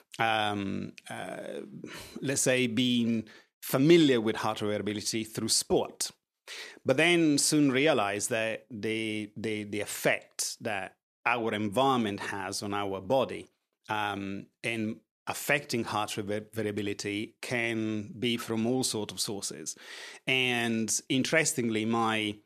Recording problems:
none

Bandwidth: 14 kHz